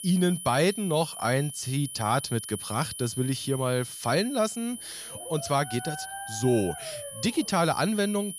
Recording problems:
high-pitched whine; noticeable; throughout; 10 kHz, 10 dB below the speech
dog barking; faint; from 5 to 7.5 s; peak 10 dB below the speech

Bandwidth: 14.5 kHz